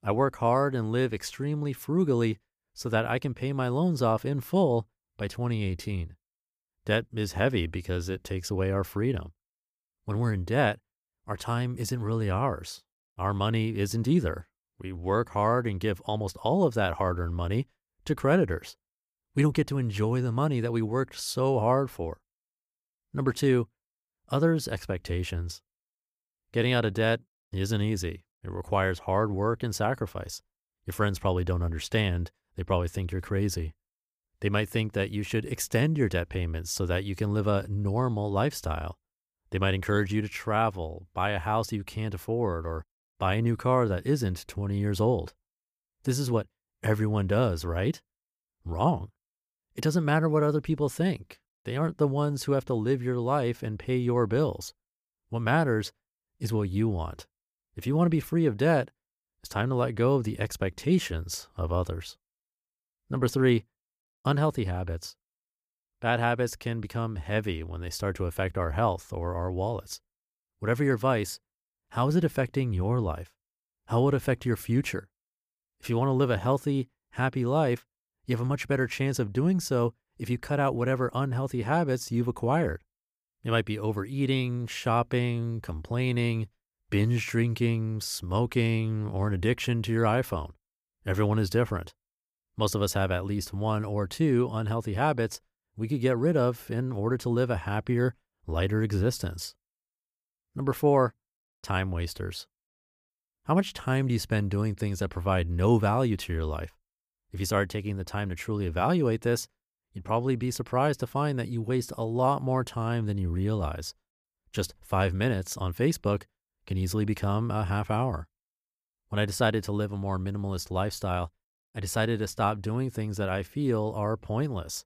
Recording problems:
none

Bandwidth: 15 kHz